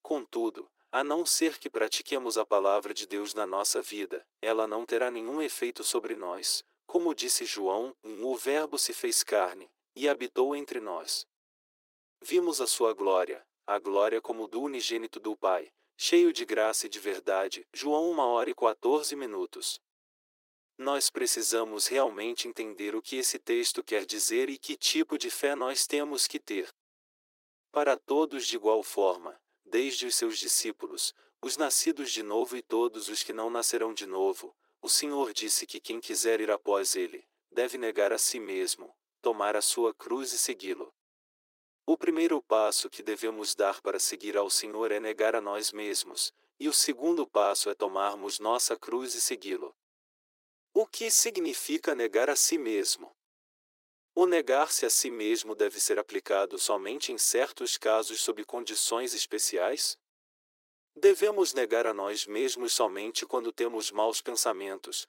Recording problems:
thin; very; fading below 350 Hz

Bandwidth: 16 kHz